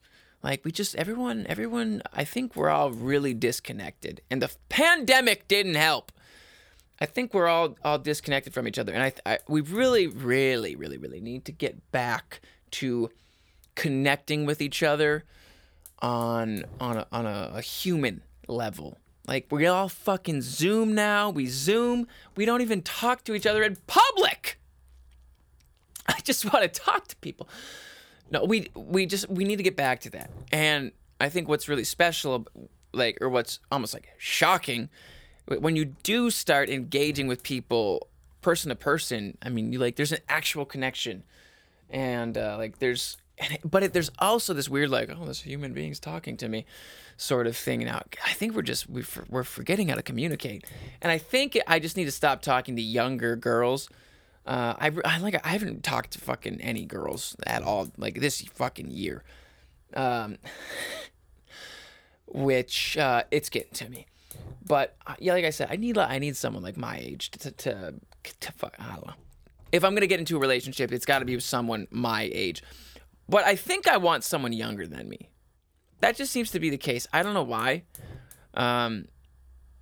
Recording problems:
hiss; faint; throughout; 25 dB below the speech

